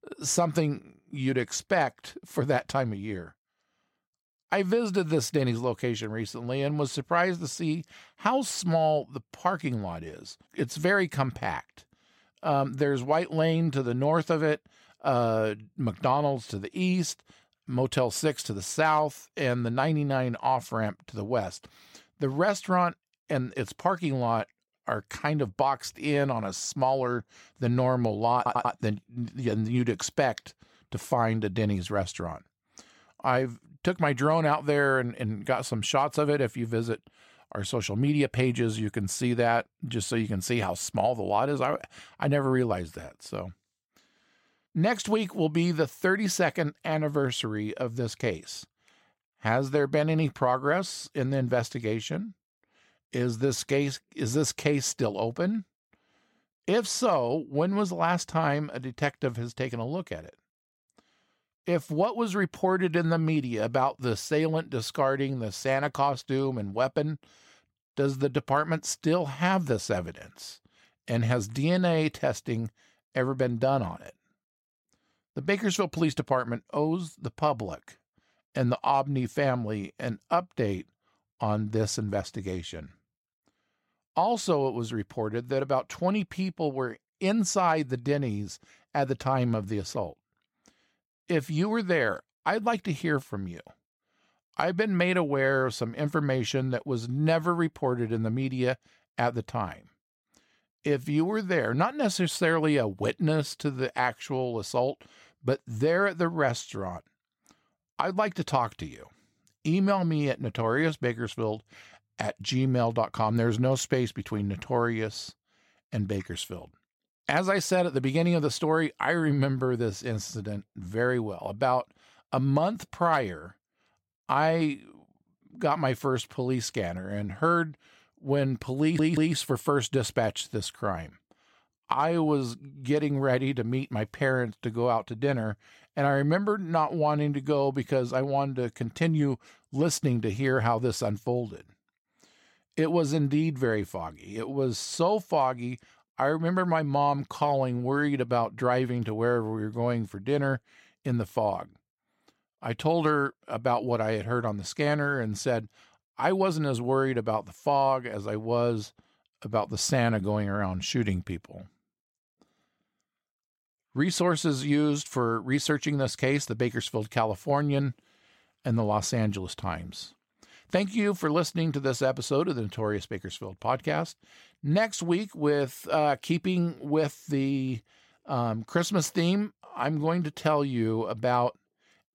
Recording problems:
audio stuttering; at 28 s and at 2:09

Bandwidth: 16.5 kHz